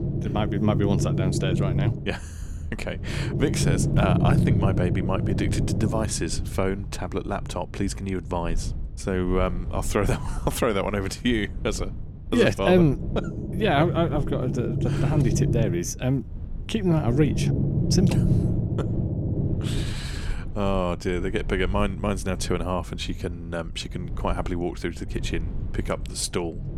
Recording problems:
low rumble; loud; throughout; 7 dB below the speech

